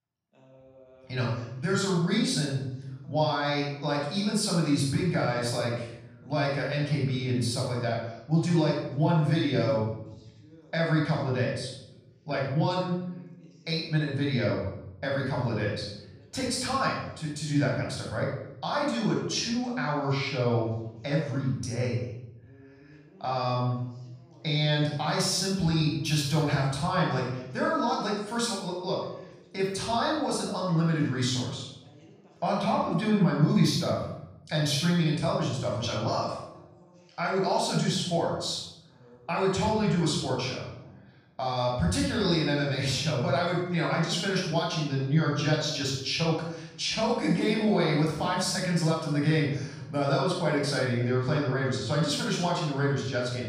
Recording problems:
off-mic speech; far
room echo; noticeable; dies away in 0.8 s
voice in the background; faint; throughout; 30 dB below the speech

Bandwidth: 15 kHz